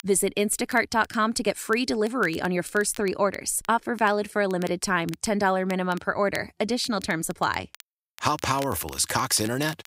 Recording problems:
crackle, like an old record; faint; 20 dB below the speech

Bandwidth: 15.5 kHz